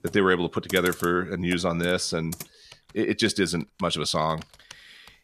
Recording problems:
household noises; noticeable; throughout; 15 dB below the speech

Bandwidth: 14.5 kHz